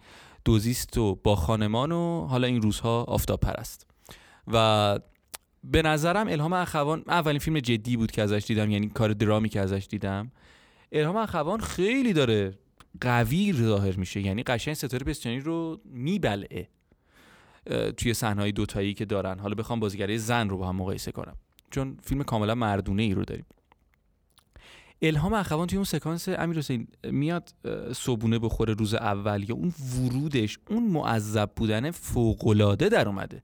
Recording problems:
none

